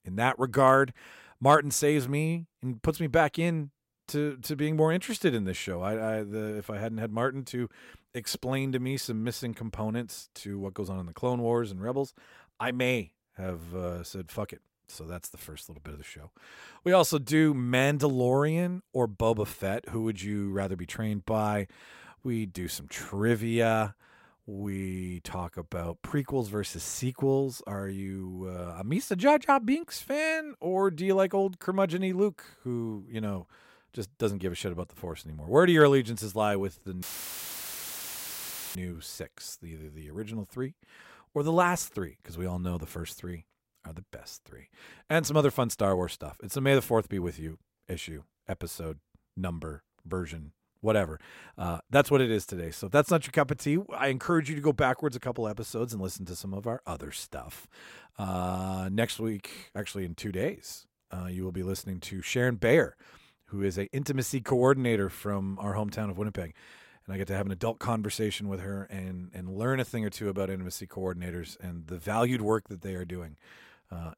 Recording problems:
audio cutting out; filled with static; at 37 s for 1.5 s

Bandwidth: 16 kHz